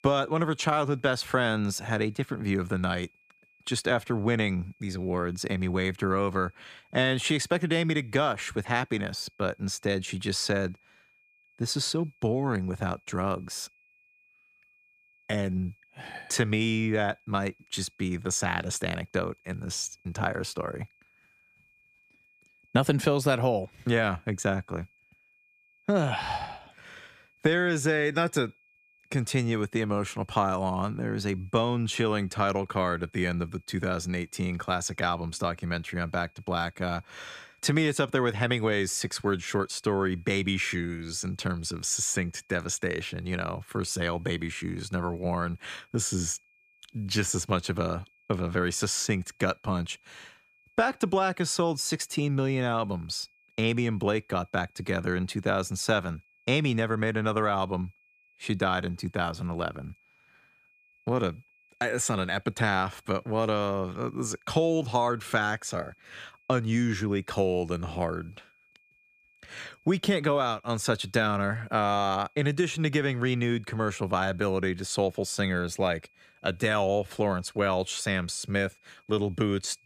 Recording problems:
high-pitched whine; faint; throughout; 2.5 kHz, 35 dB below the speech

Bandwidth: 14.5 kHz